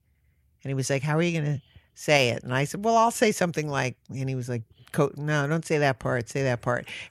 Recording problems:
none

